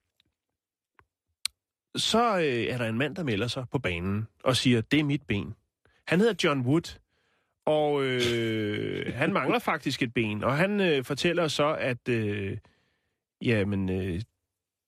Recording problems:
none

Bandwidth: 14 kHz